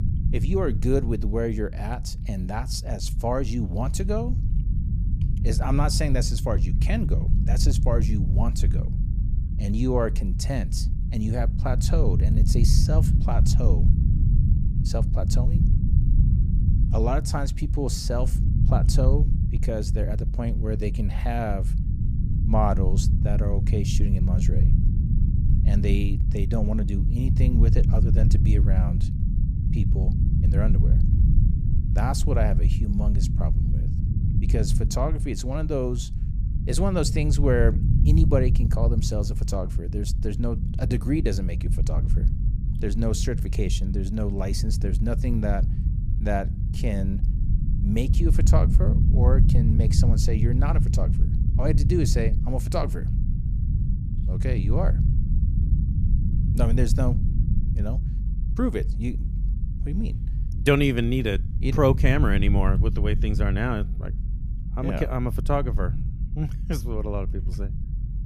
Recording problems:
low rumble; loud; throughout; 8 dB below the speech

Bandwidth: 14.5 kHz